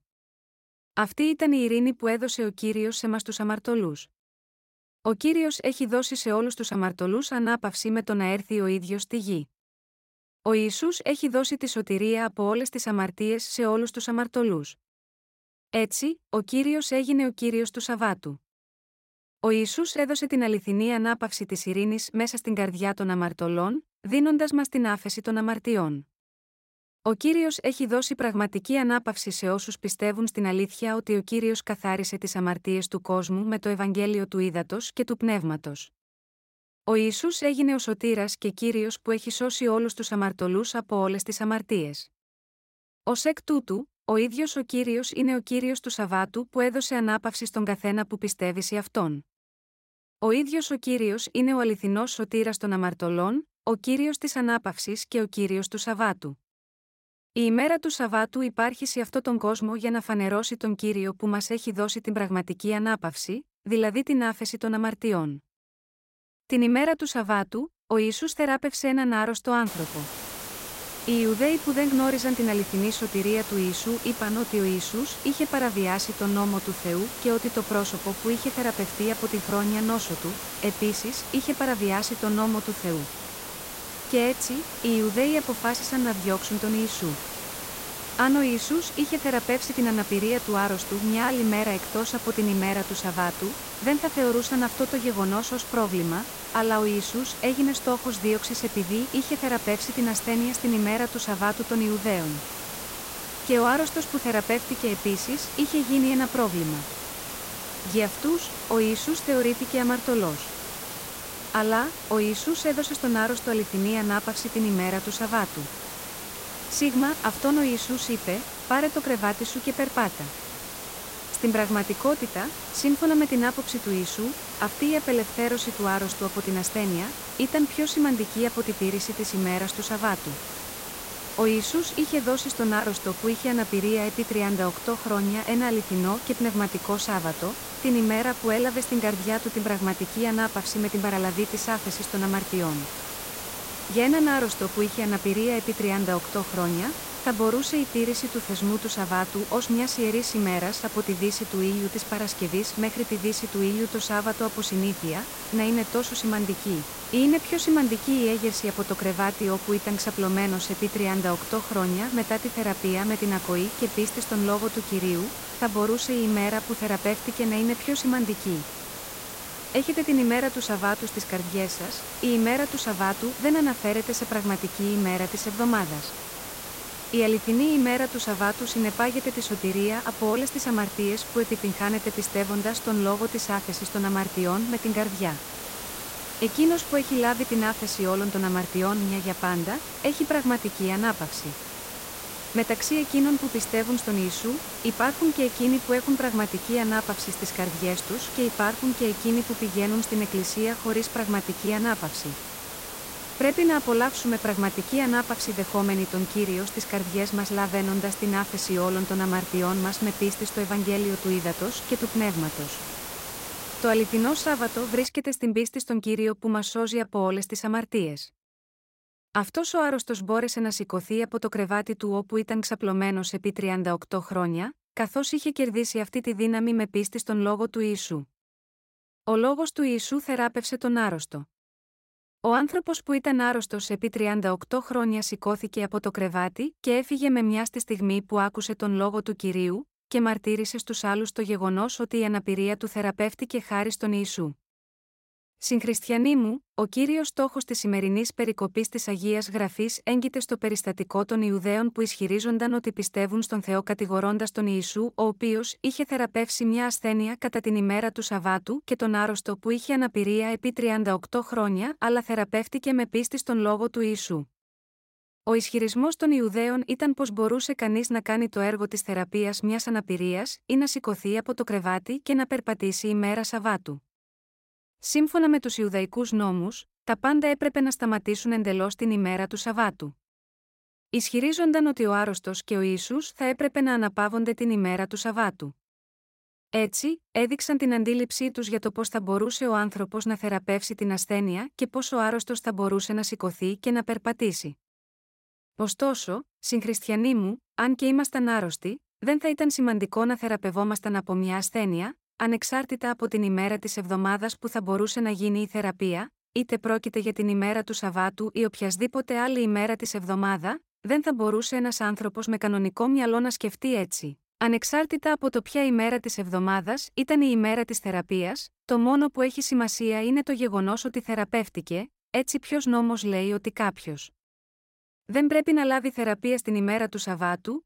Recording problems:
hiss; loud; from 1:10 to 3:35; 8 dB below the speech

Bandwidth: 16 kHz